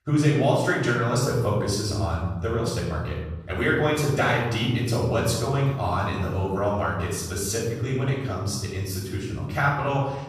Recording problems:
off-mic speech; far
room echo; noticeable; dies away in 1.5 s

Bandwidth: 14.5 kHz